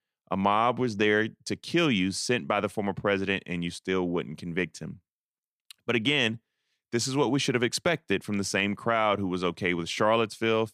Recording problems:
none

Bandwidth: 15 kHz